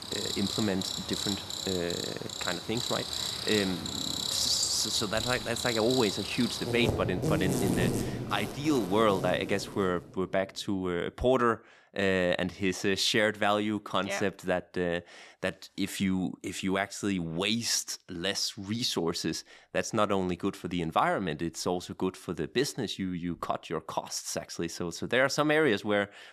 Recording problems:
animal sounds; loud; until 9.5 s; 3 dB below the speech

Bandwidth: 14 kHz